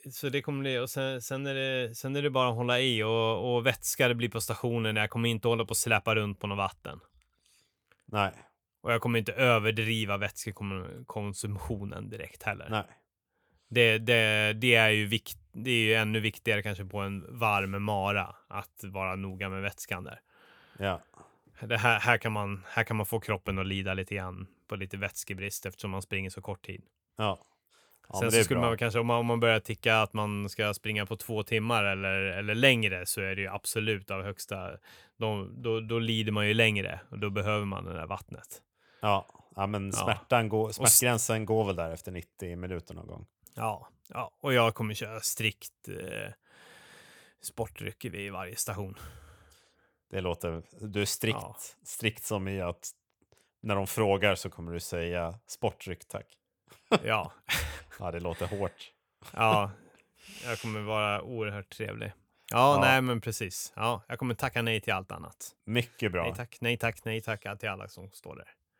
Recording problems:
none

